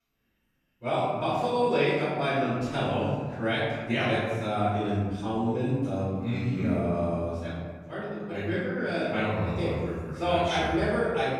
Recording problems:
room echo; strong; dies away in 1.6 s
off-mic speech; far

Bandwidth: 14.5 kHz